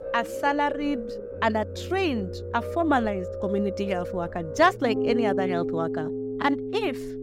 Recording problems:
background music; loud; throughout; 5 dB below the speech
low rumble; faint; throughout; 25 dB below the speech

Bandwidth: 16 kHz